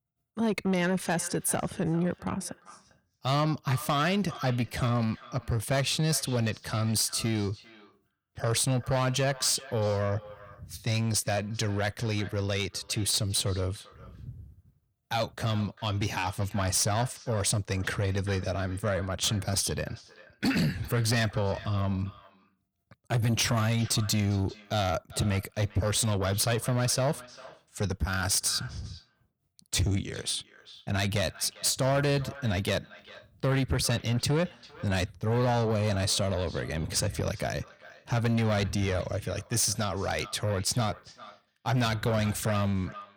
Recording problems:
echo of what is said; faint; throughout; 400 ms later, 20 dB below the speech
distortion; slight; 10 dB below the speech

